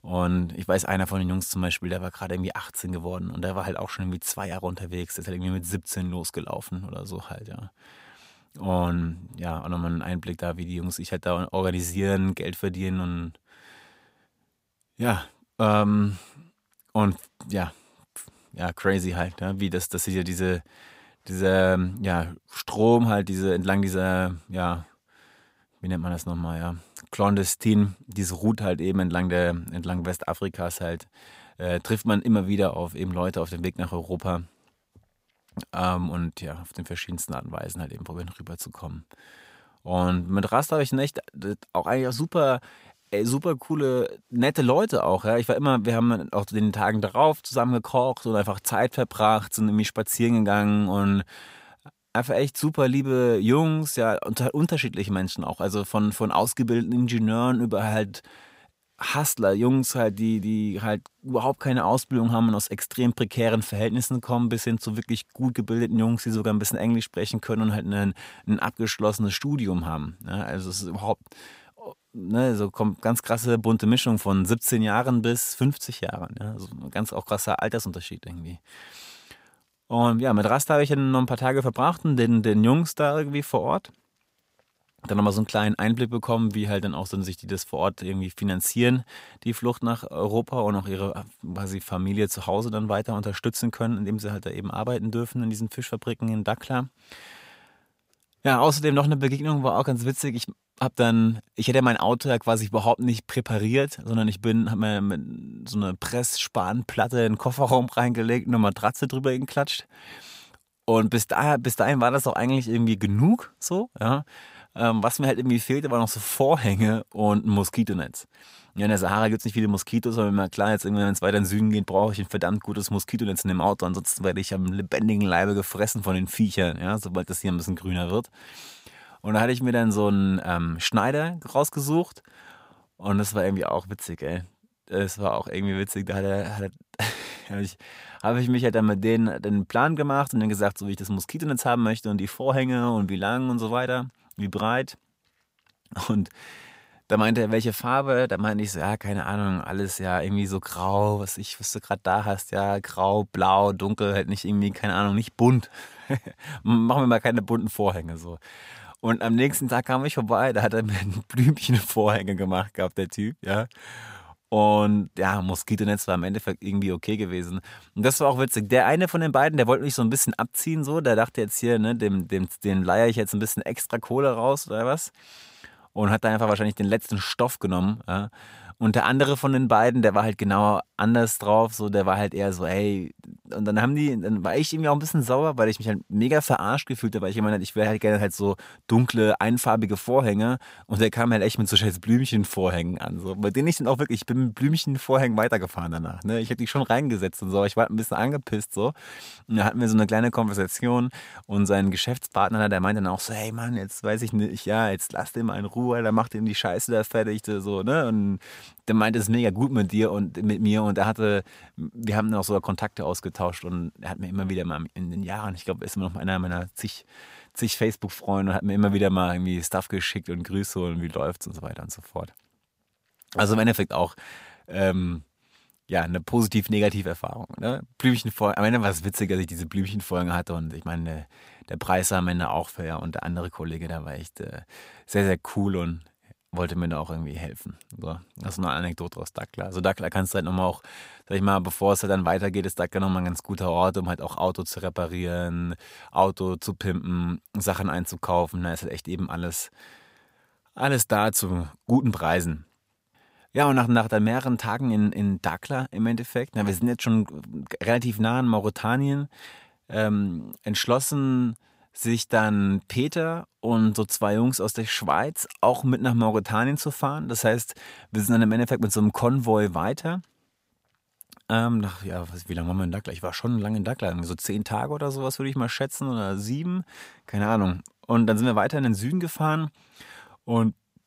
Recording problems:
none

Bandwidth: 15.5 kHz